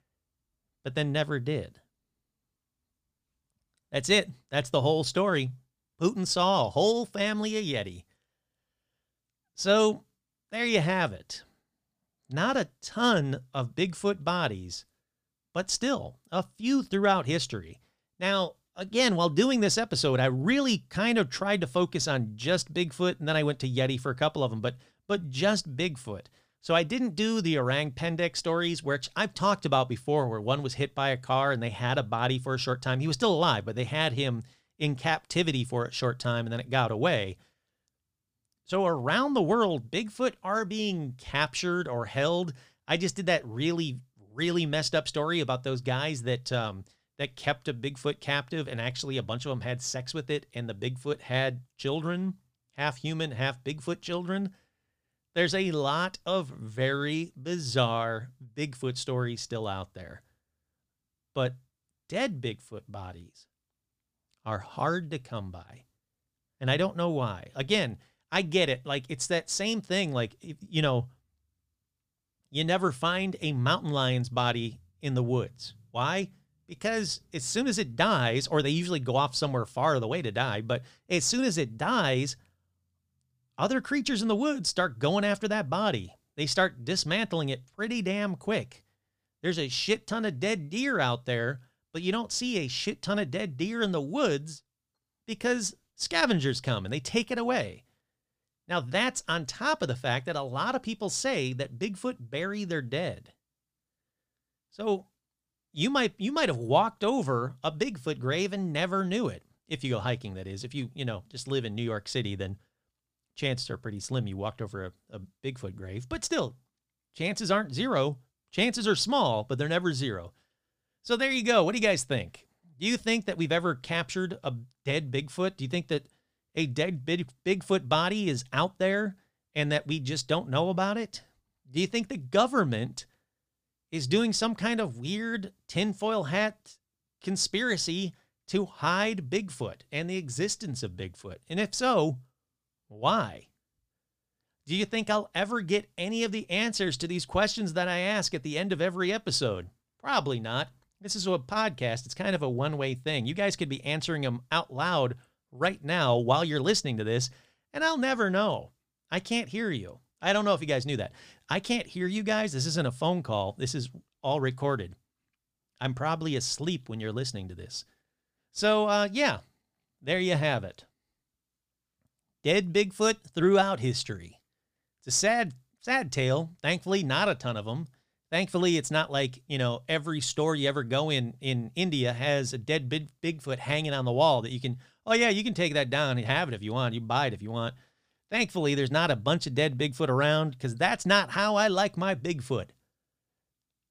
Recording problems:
none

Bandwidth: 15 kHz